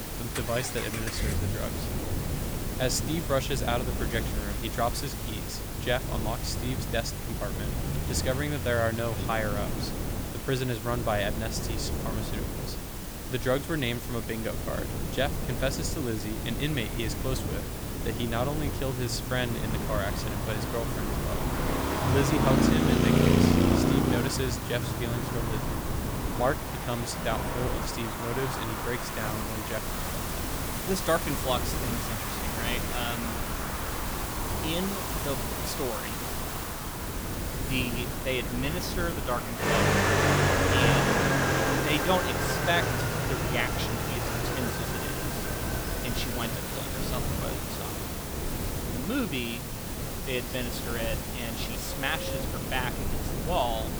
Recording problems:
traffic noise; very loud; throughout; 1 dB above the speech
wind noise on the microphone; heavy; 10 dB below the speech
hiss; loud; throughout; 4 dB below the speech

